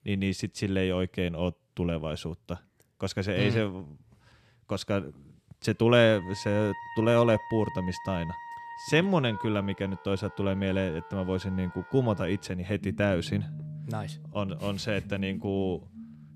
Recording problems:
background music; noticeable; from 6.5 s on; 15 dB below the speech

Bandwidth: 14 kHz